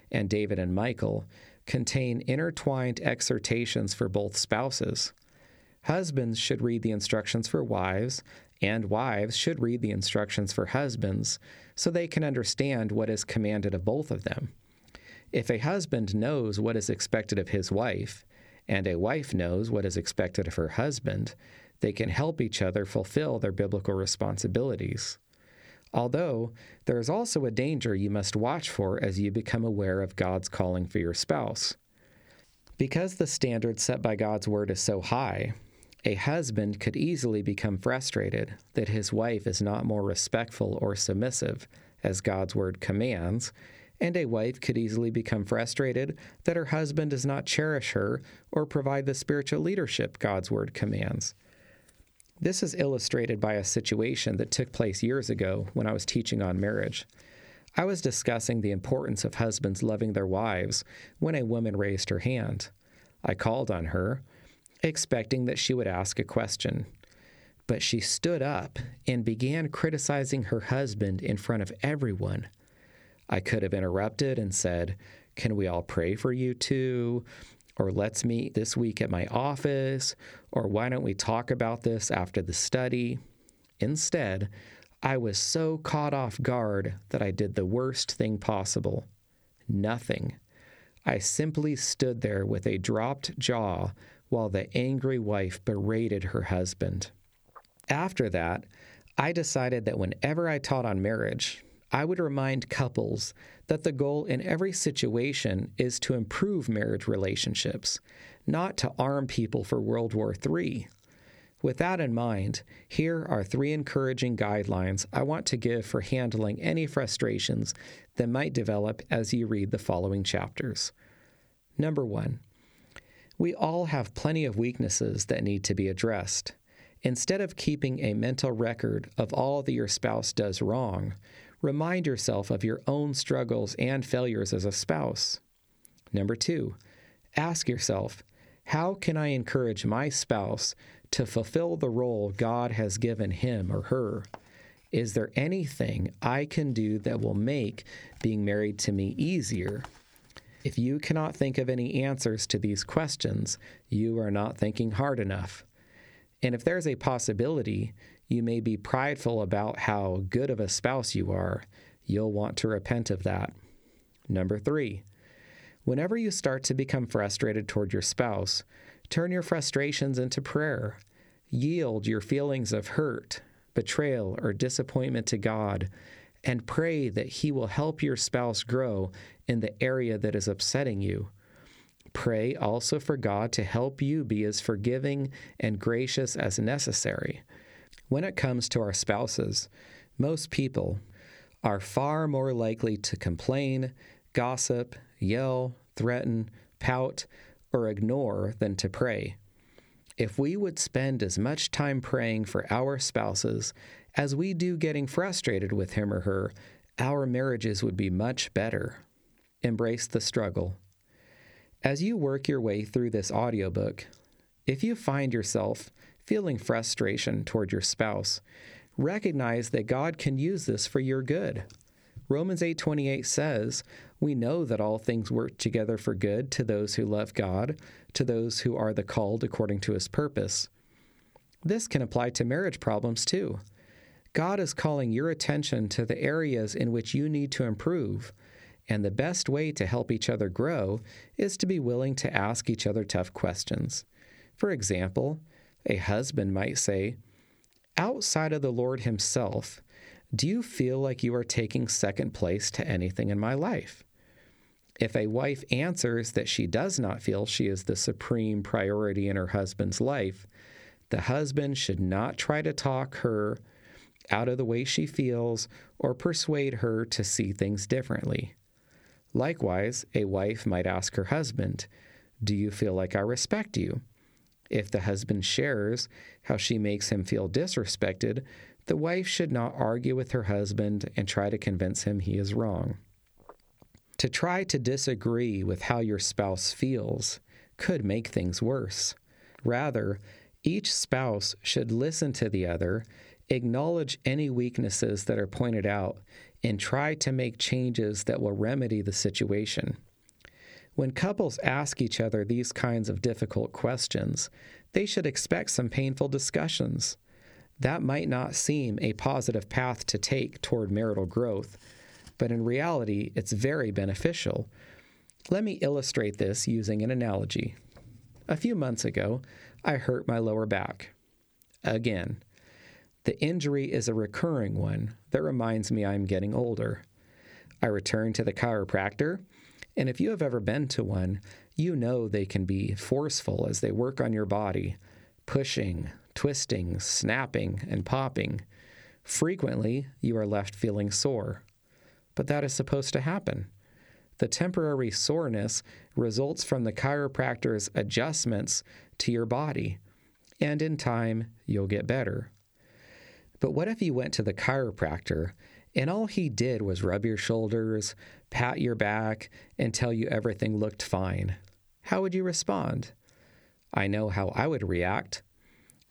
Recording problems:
squashed, flat; somewhat

